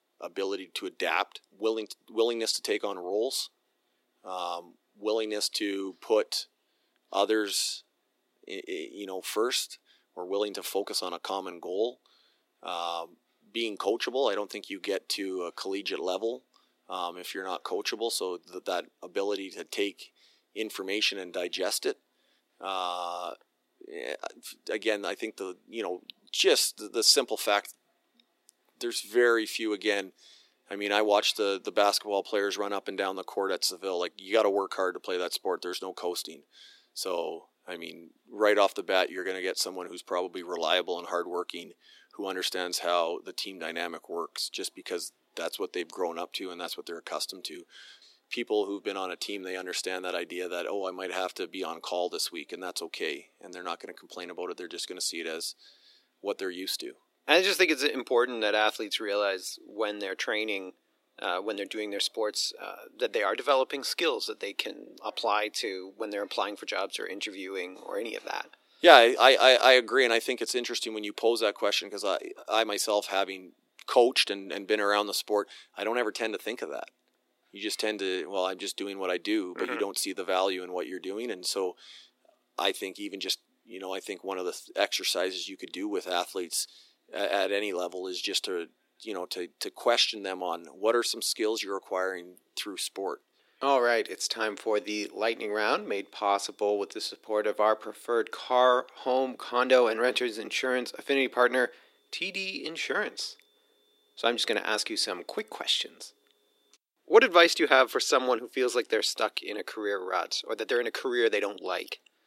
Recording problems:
thin; somewhat; fading below 300 Hz

